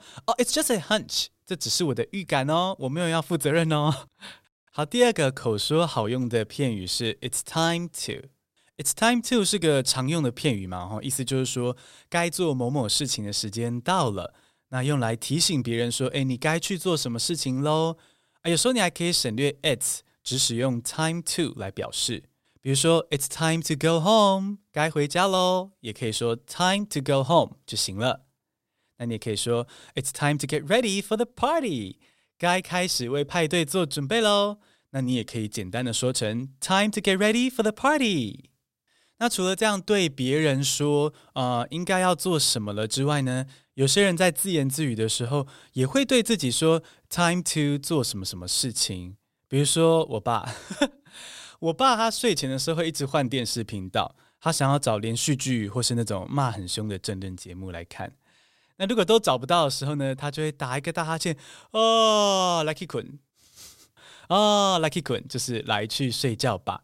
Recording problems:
none

